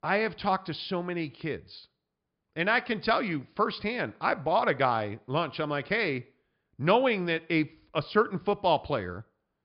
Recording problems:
high frequencies cut off; noticeable; nothing above 5 kHz

